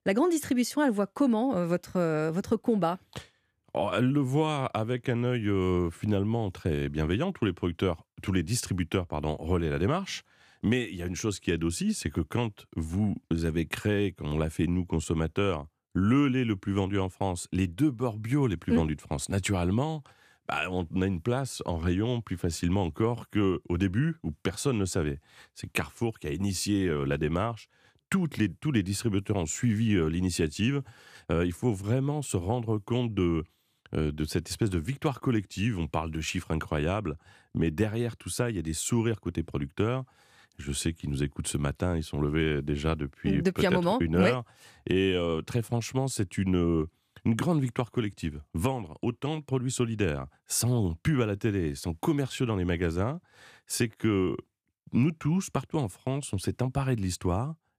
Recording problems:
none

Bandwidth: 15 kHz